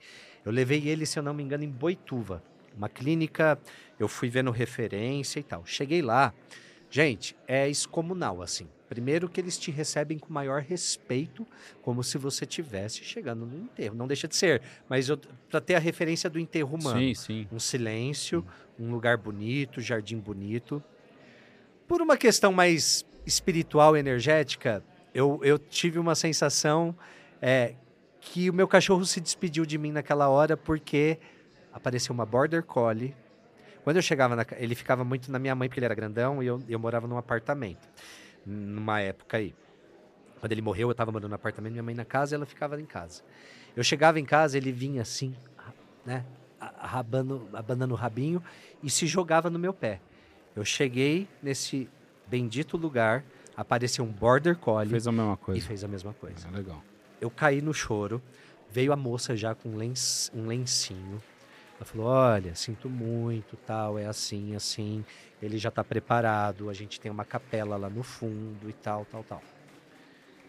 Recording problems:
murmuring crowd; faint; throughout; 30 dB below the speech
uneven, jittery; strongly; from 14 s to 1:06

